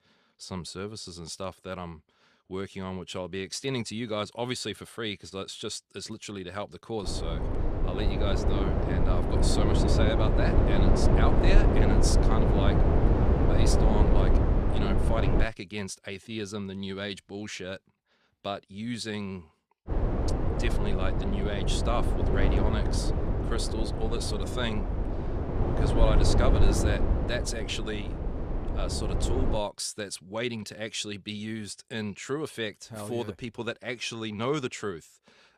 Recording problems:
wind noise on the microphone; heavy; from 7 to 15 s and from 20 to 30 s; 1 dB above the speech

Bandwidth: 14 kHz